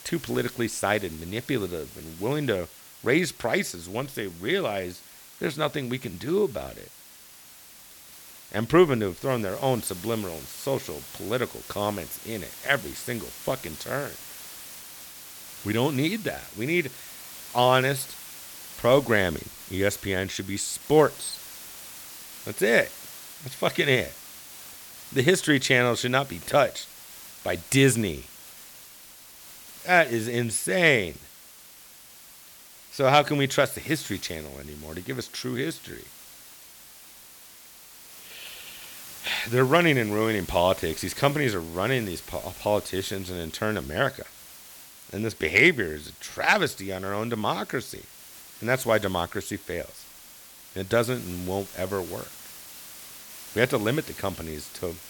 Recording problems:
hiss; noticeable; throughout; 15 dB below the speech

